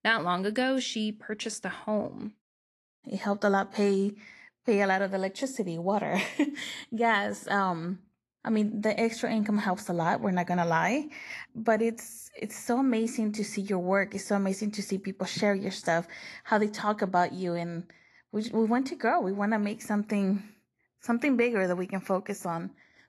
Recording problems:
garbled, watery; slightly; nothing above 12 kHz

